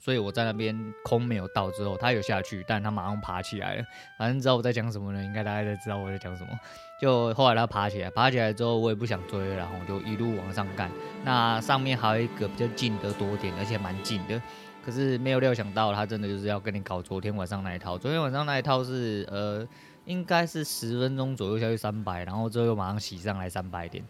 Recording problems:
background music; noticeable; throughout; 15 dB below the speech

